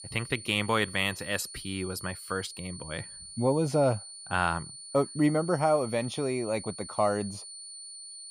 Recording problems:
high-pitched whine; noticeable; throughout; 9 kHz, 10 dB below the speech

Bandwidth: 15 kHz